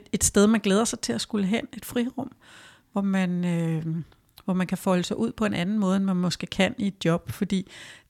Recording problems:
none

